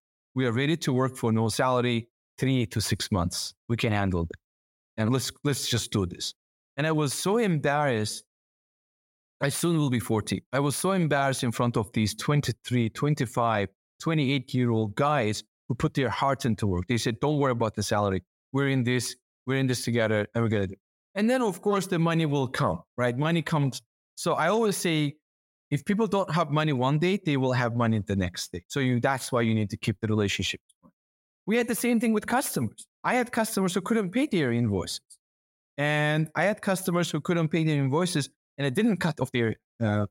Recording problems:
uneven, jittery; slightly; from 5 to 39 s

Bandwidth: 16 kHz